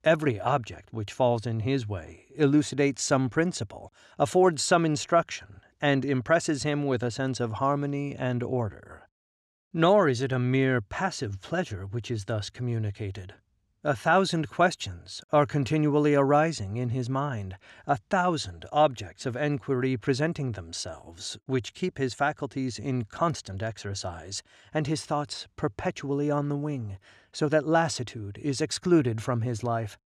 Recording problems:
none

